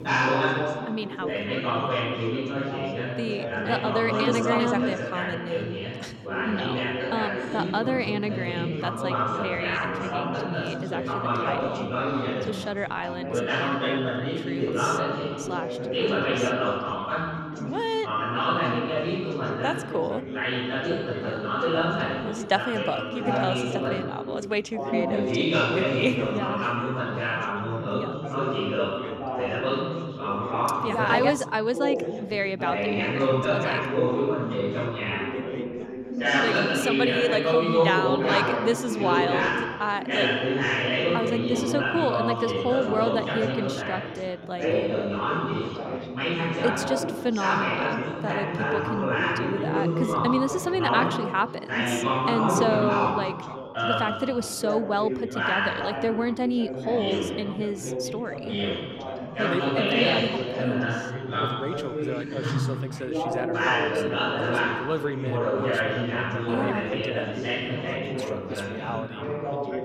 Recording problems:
chatter from many people; very loud; throughout; 3 dB above the speech

